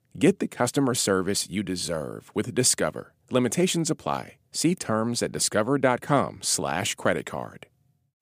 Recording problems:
none

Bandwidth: 15 kHz